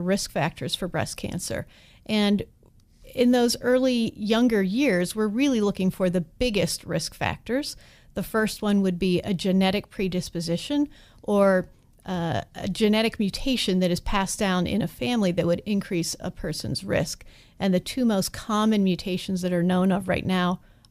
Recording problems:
abrupt cut into speech; at the start

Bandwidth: 15 kHz